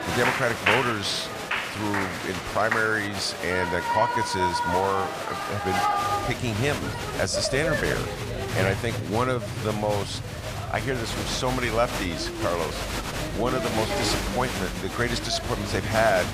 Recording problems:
crowd noise; loud; throughout; 1 dB below the speech

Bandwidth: 15 kHz